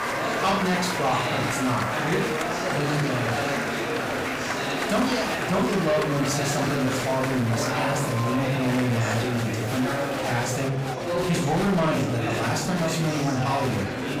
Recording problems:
off-mic speech; far
room echo; noticeable; dies away in 0.4 s
distortion; slight; 10 dB below the speech
murmuring crowd; loud; throughout; 1 dB below the speech
hiss; faint; until 10 s; 25 dB below the speech

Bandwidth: 15.5 kHz